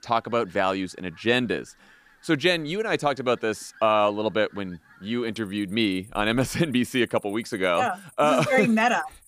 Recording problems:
animal sounds; faint; throughout; 30 dB below the speech

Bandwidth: 15 kHz